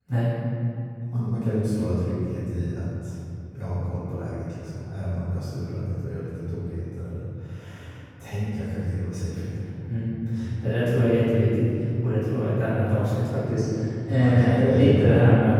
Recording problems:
room echo; strong; dies away in 3 s
off-mic speech; far

